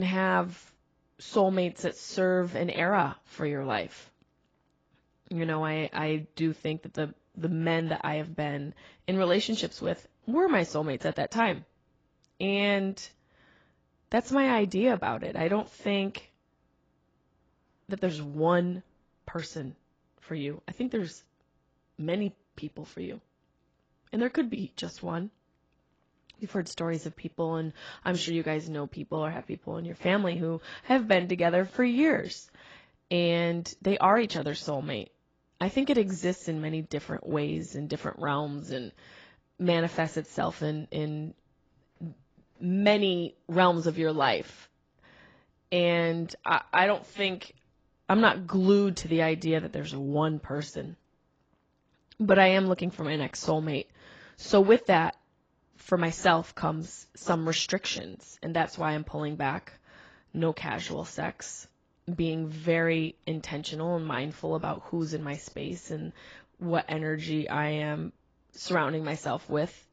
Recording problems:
garbled, watery; badly; nothing above 7.5 kHz
abrupt cut into speech; at the start

